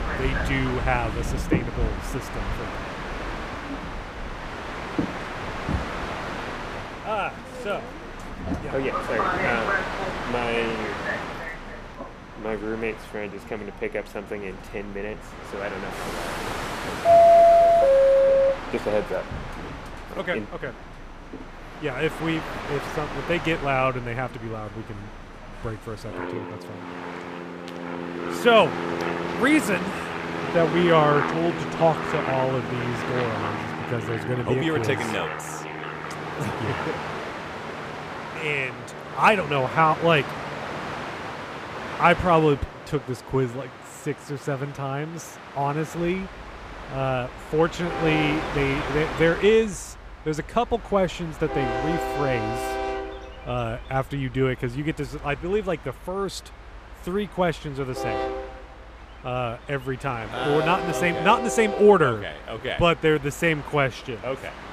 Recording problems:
train or aircraft noise; loud; throughout; 2 dB below the speech

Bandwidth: 14.5 kHz